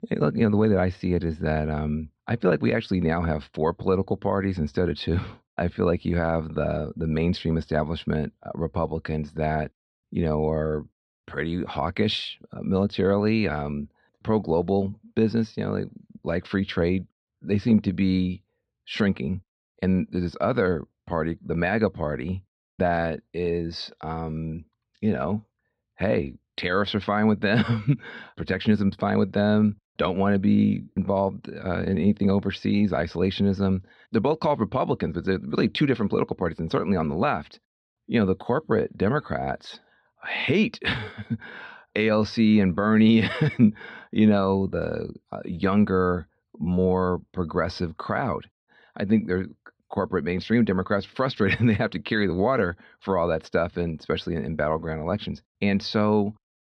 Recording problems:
muffled; very slightly; fading above 4 kHz

